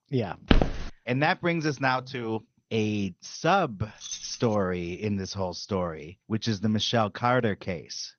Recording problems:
garbled, watery; slightly; nothing above 6.5 kHz
footsteps; loud; at 0.5 s; peak 3 dB above the speech
jangling keys; noticeable; at 4 s; peak 7 dB below the speech

